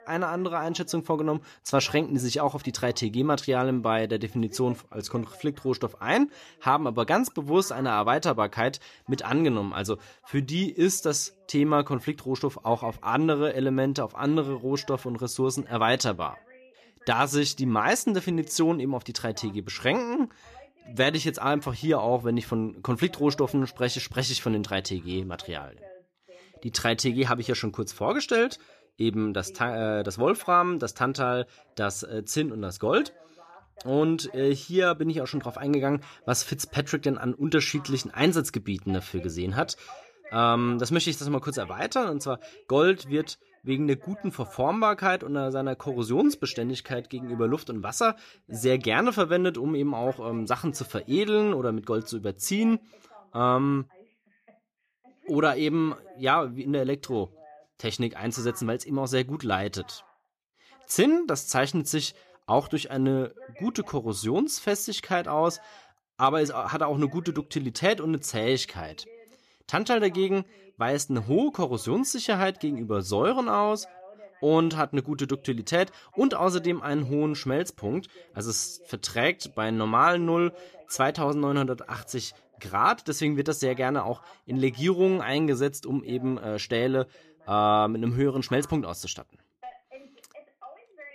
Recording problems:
voice in the background; faint; throughout; 25 dB below the speech

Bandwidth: 14.5 kHz